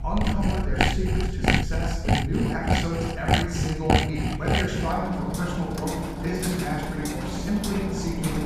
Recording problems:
room echo; strong; dies away in 1.1 s
off-mic speech; far
machinery noise; very loud; throughout; 2 dB above the speech
low rumble; faint; throughout; 20 dB below the speech

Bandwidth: 15 kHz